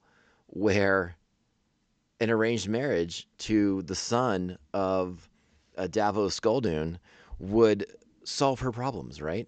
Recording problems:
high frequencies cut off; noticeable; nothing above 8 kHz

